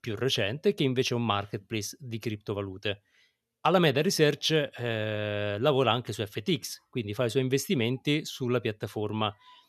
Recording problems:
none

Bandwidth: 13.5 kHz